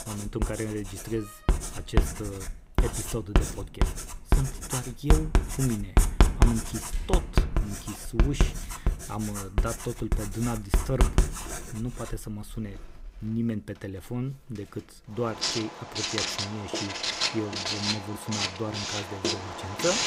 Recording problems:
household noises; very loud; throughout; 5 dB above the speech
door banging; noticeable; from 1 to 9 s; peak 8 dB below the speech

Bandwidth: 15.5 kHz